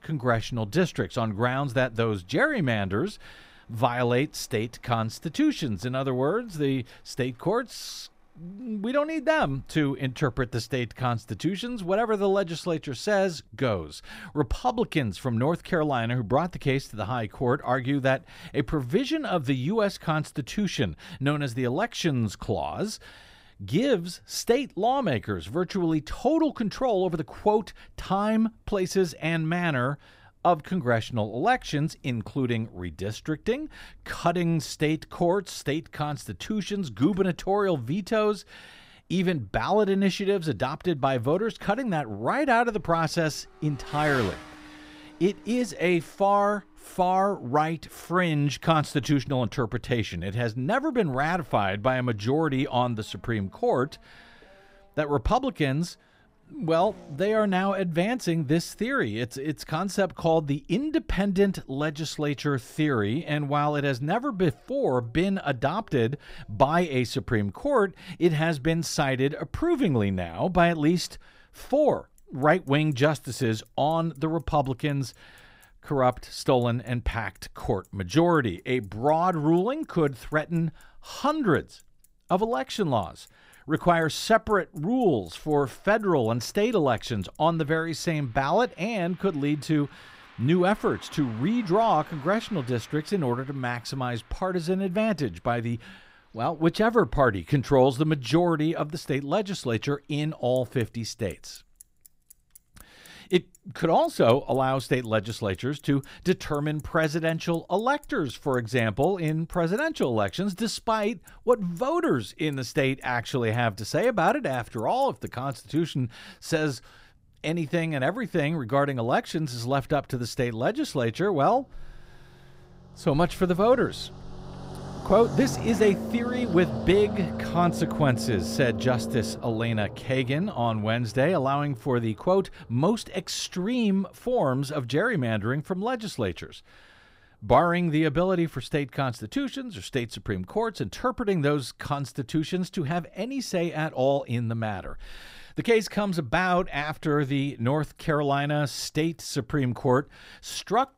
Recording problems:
traffic noise; noticeable; throughout; 15 dB below the speech

